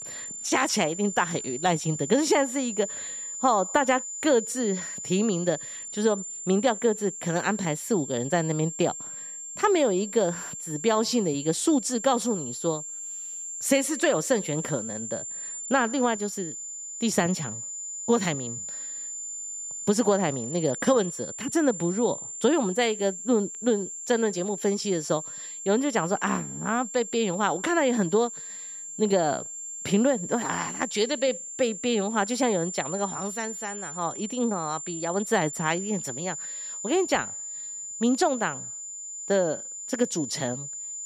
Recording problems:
high-pitched whine; loud; throughout; 7 kHz, 7 dB below the speech

